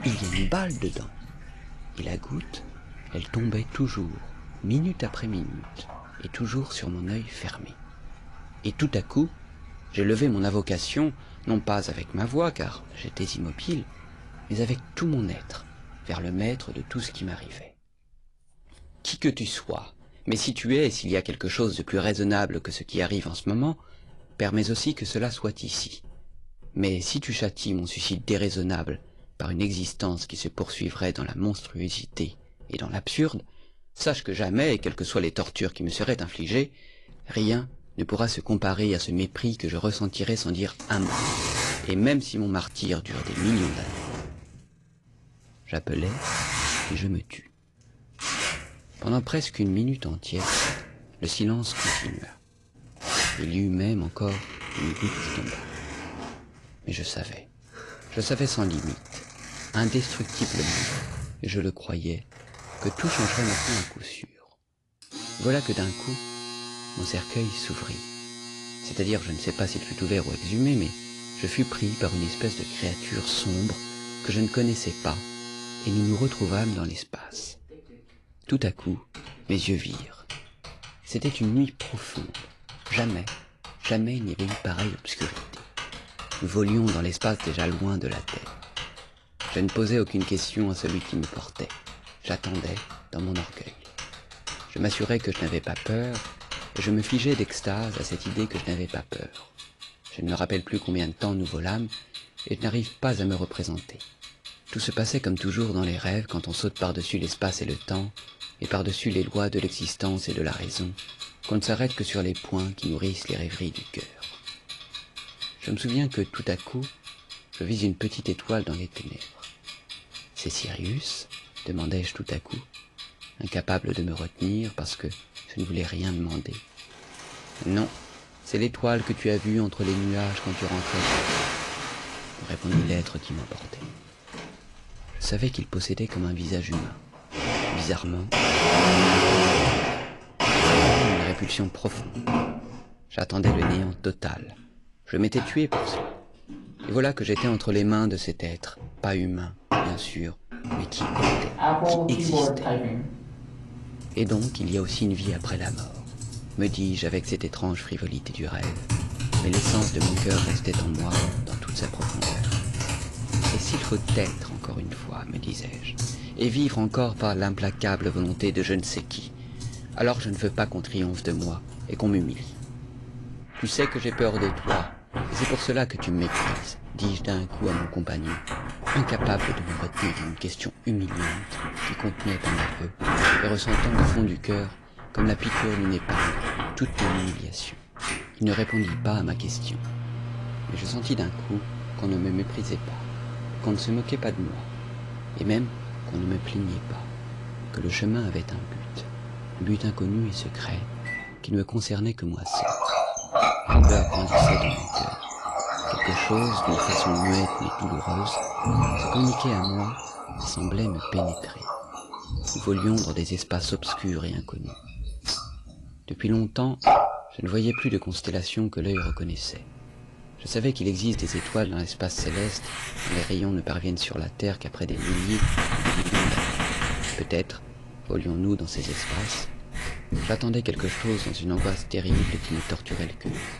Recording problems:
distortion; slight; 10 dB below the speech
garbled, watery; slightly; nothing above 10.5 kHz
household noises; loud; throughout; 1 dB below the speech

